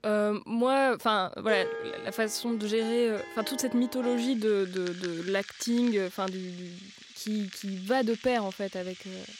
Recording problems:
background music; noticeable; throughout; 15 dB below the speech

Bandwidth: 16 kHz